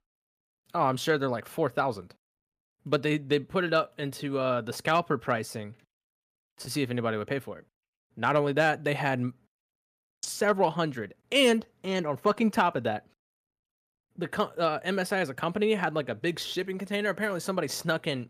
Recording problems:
none

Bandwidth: 15 kHz